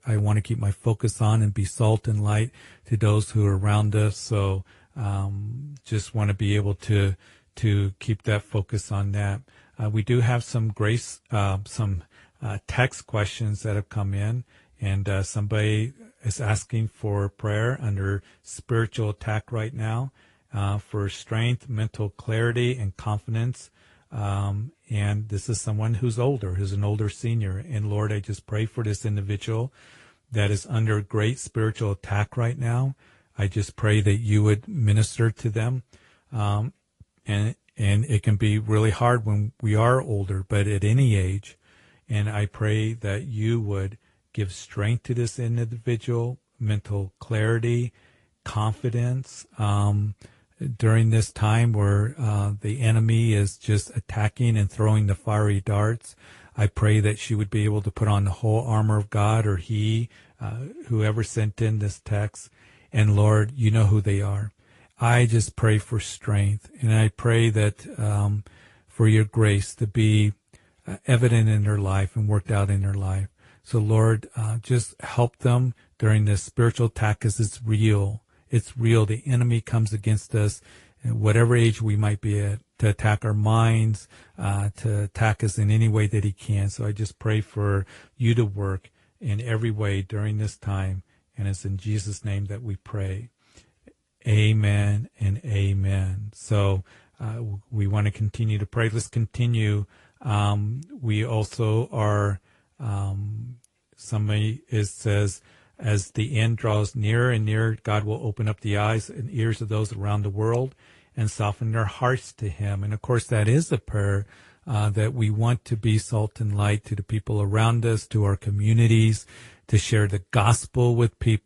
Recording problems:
garbled, watery; slightly; nothing above 11 kHz

